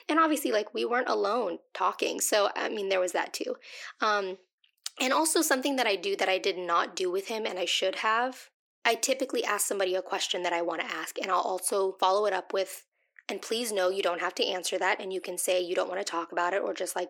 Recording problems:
thin; somewhat; fading below 300 Hz

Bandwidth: 17 kHz